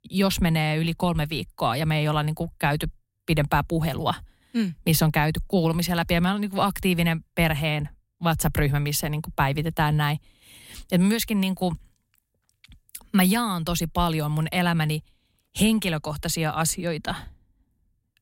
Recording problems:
none

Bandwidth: 16 kHz